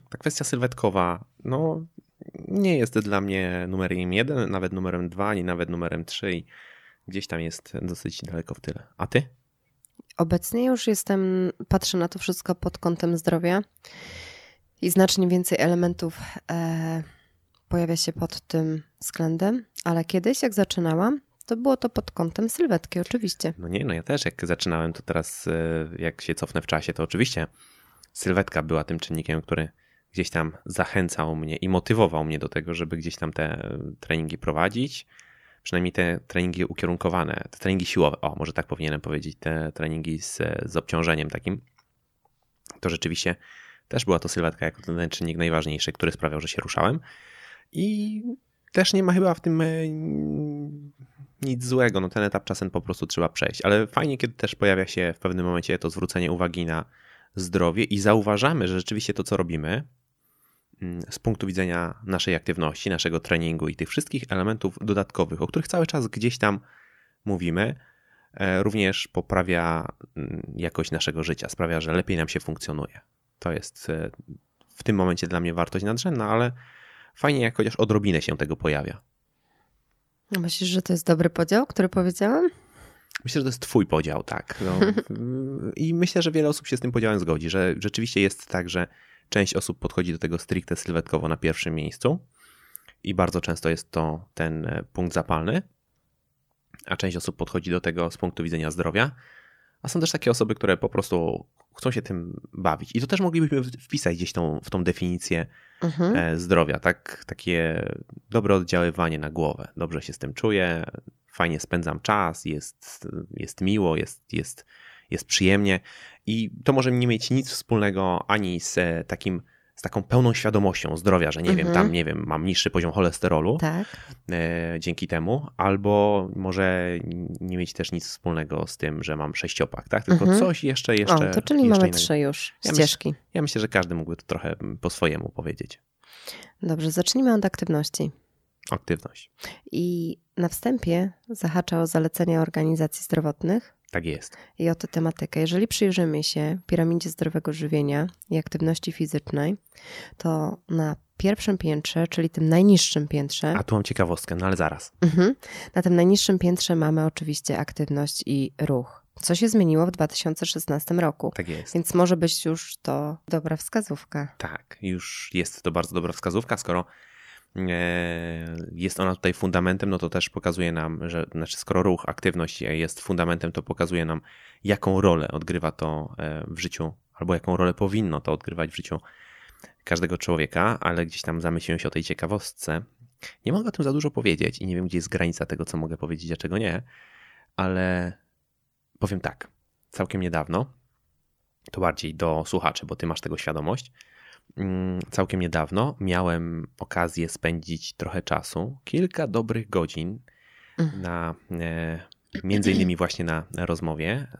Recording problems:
none

